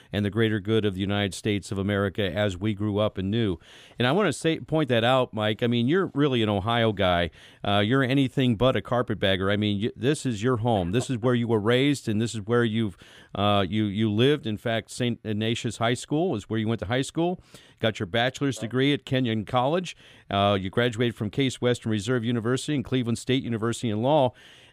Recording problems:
none

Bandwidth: 15 kHz